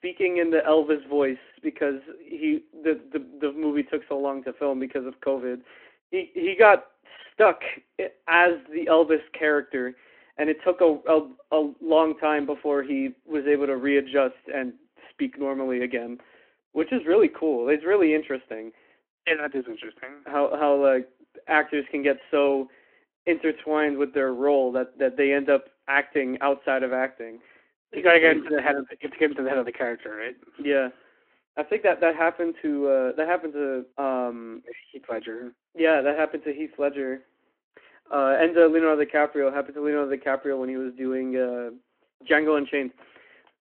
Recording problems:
phone-call audio

